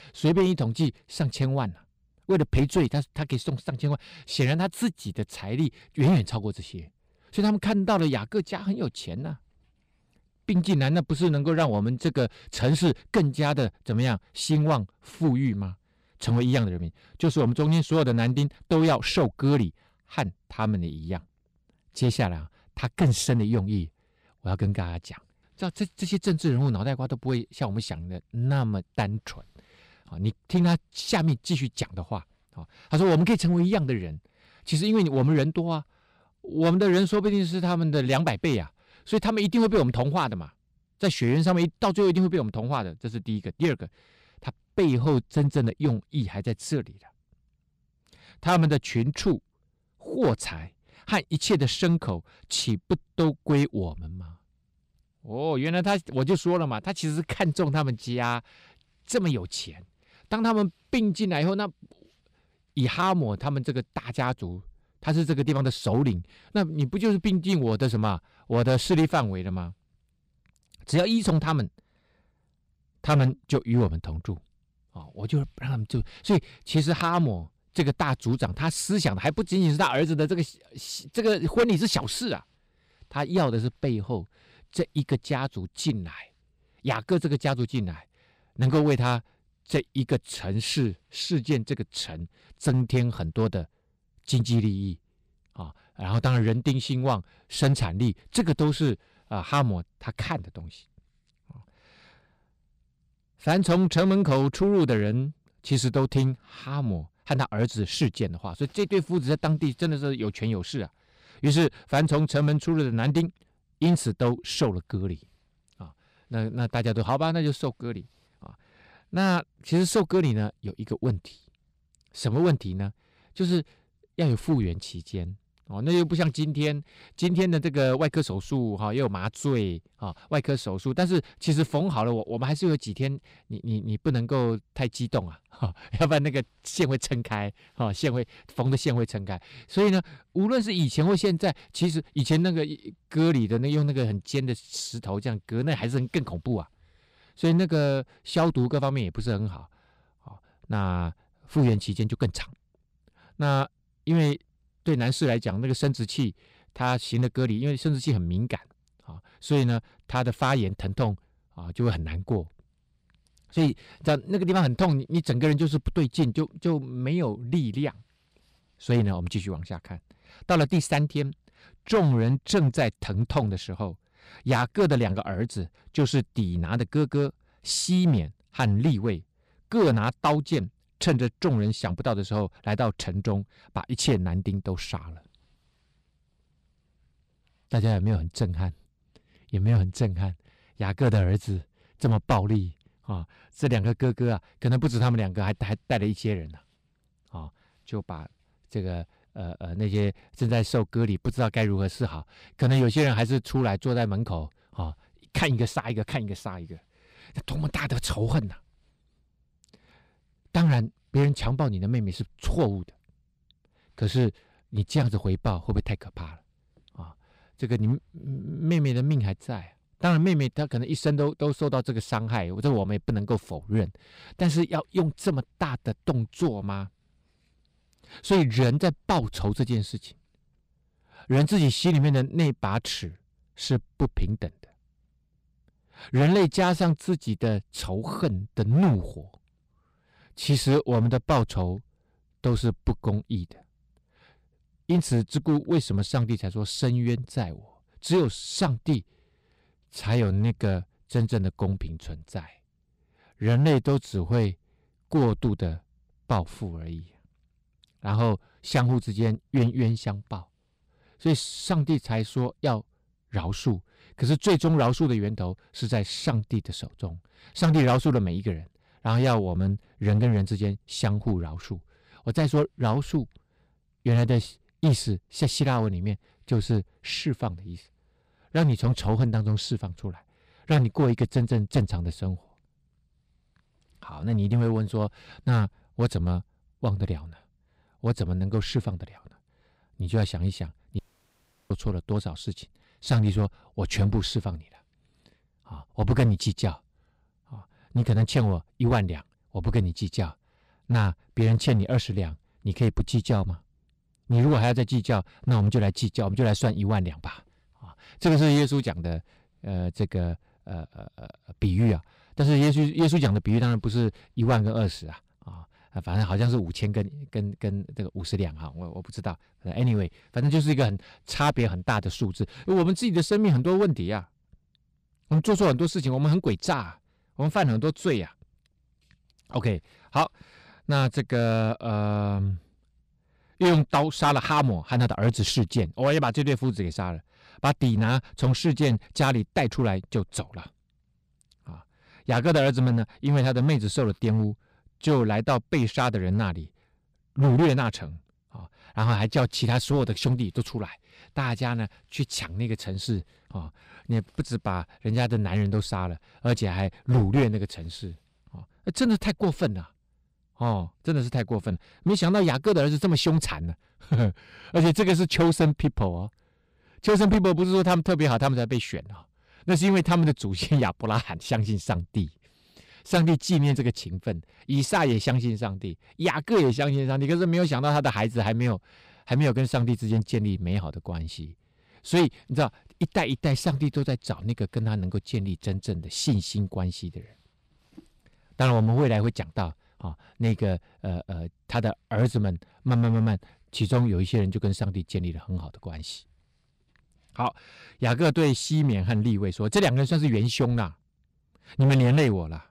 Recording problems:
distortion; slight; 4% of the sound clipped
audio cutting out; at 4:51 for 0.5 s

